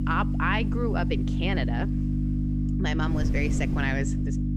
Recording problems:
electrical hum; loud; throughout; 50 Hz, 6 dB below the speech
wind noise on the microphone; occasional gusts; 20 dB below the speech

